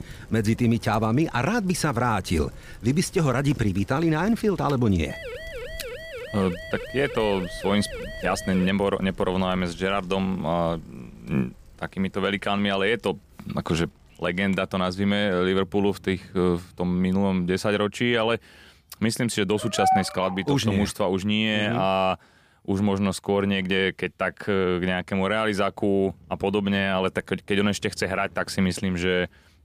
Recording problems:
traffic noise; faint; throughout; 25 dB below the speech
siren; faint; from 5 to 8.5 s; peak 10 dB below the speech
dog barking; loud; at 20 s; peak 2 dB above the speech

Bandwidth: 15 kHz